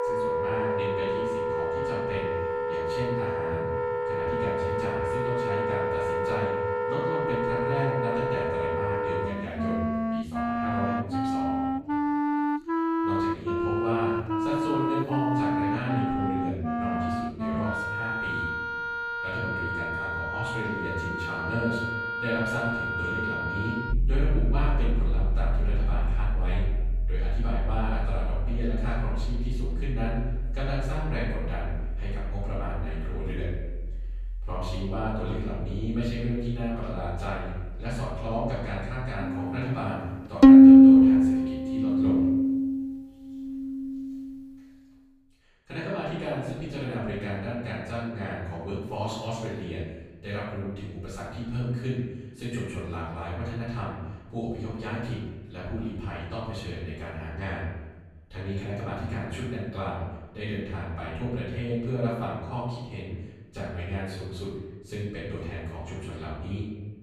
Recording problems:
room echo; strong; dies away in 1.1 s
off-mic speech; far
background music; very loud; until 45 s; 8 dB above the speech

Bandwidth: 15 kHz